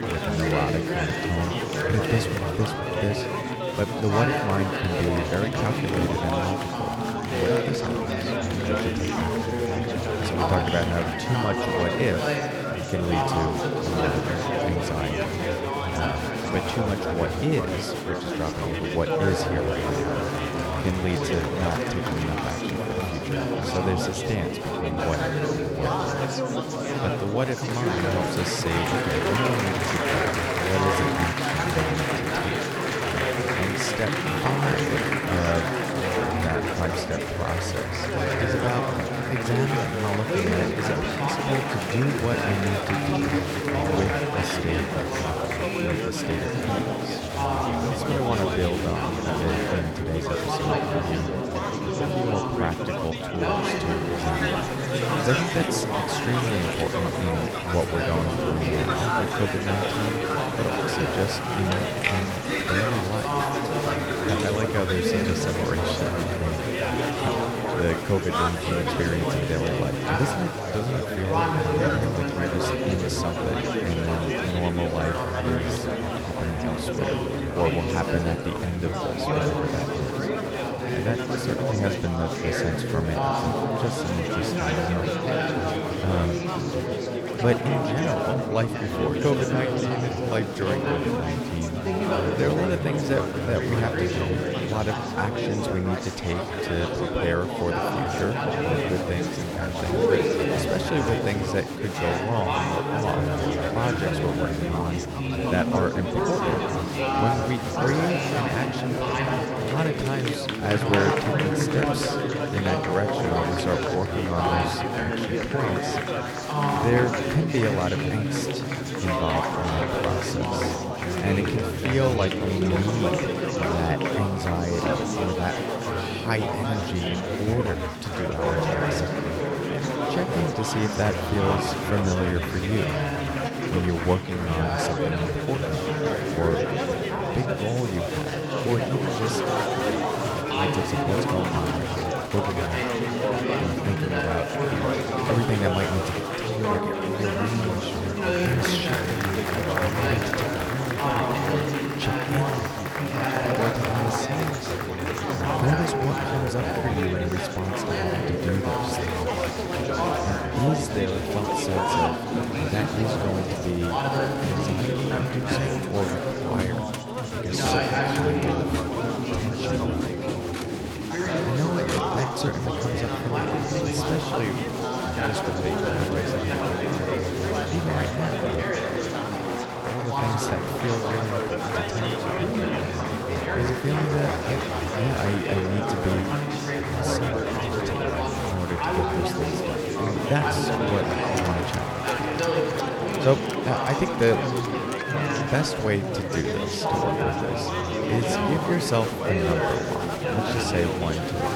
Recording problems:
chatter from many people; very loud; throughout; 3 dB above the speech

